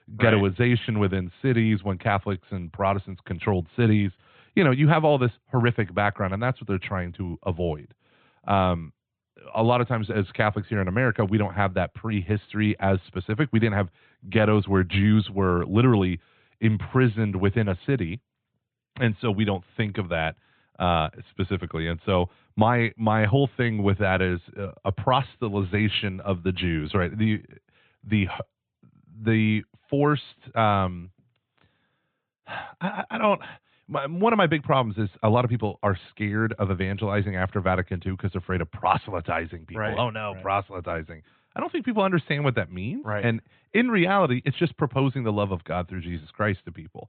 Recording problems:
high frequencies cut off; severe; nothing above 4 kHz

